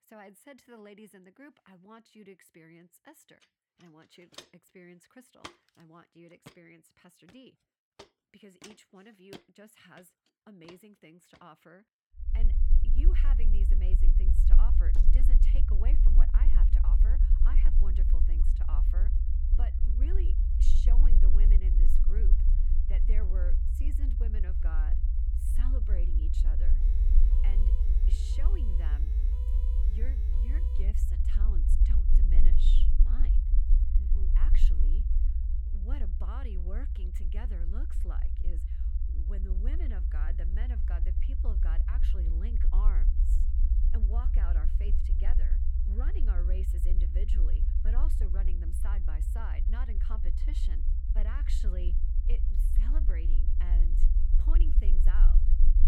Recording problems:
low rumble; loud; from 12 s on; 1 dB below the speech
footsteps; loud; from 4.5 to 11 s; peak 4 dB above the speech
door banging; noticeable; at 15 s; peak 7 dB below the speech
siren; noticeable; from 27 to 31 s; peak 8 dB below the speech

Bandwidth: 18 kHz